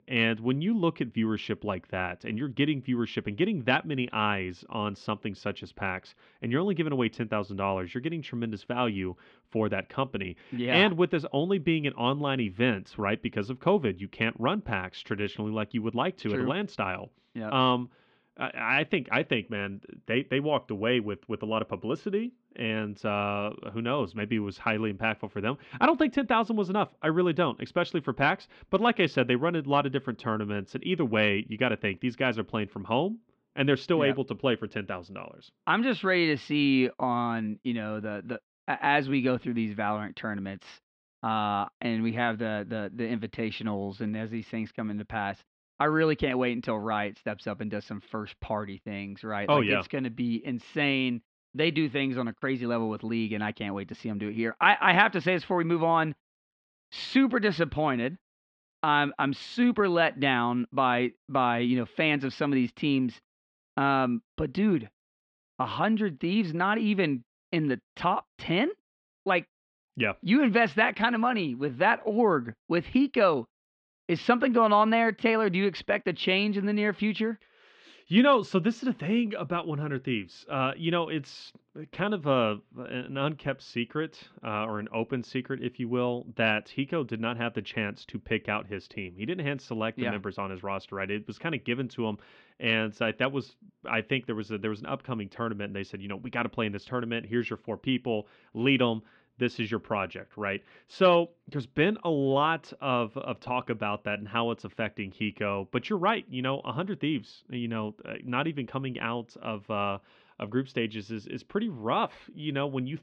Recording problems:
muffled; slightly; fading above 3.5 kHz

